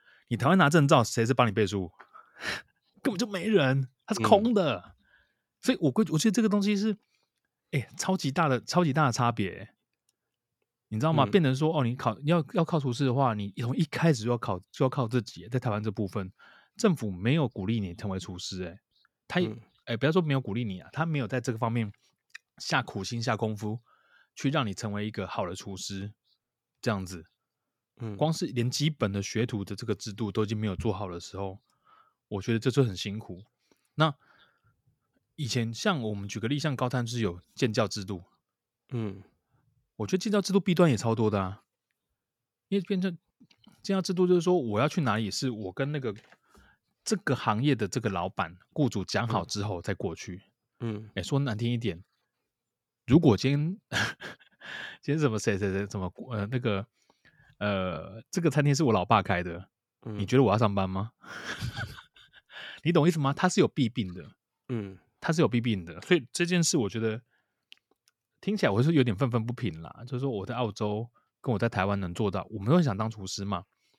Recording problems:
none

